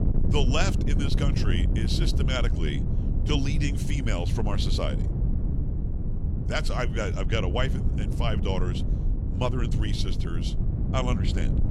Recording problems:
wind noise on the microphone; heavy; 7 dB below the speech

